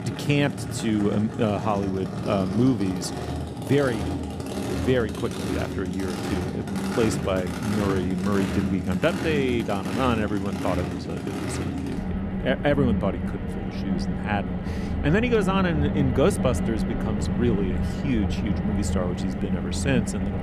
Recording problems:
traffic noise; loud; throughout; 2 dB below the speech

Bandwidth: 15 kHz